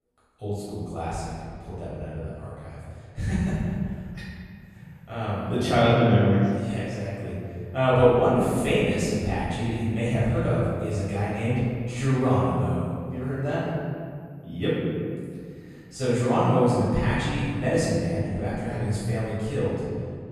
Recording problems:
room echo; strong; dies away in 2.1 s
off-mic speech; far

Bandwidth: 15.5 kHz